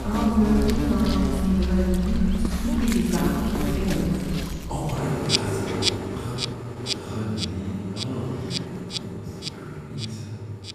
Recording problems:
room echo; strong; dies away in 1.9 s
off-mic speech; far
animal sounds; loud; throughout; 2 dB below the speech

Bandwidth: 14.5 kHz